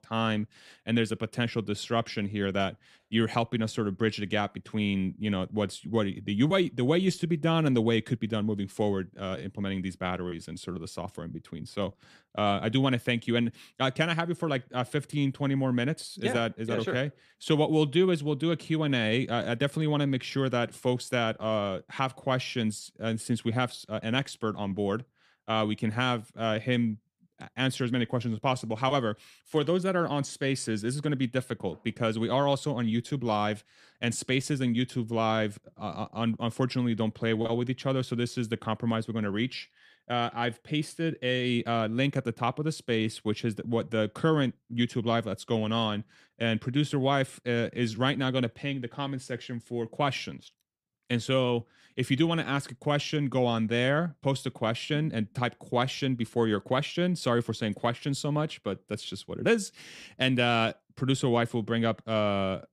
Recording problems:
none

